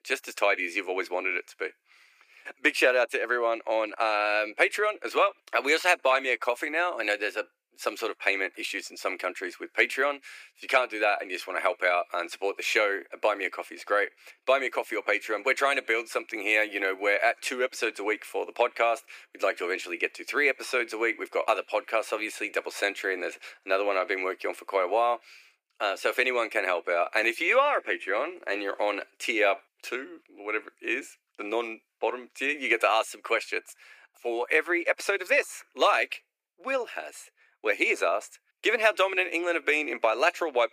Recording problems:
thin; very; fading below 400 Hz

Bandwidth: 15 kHz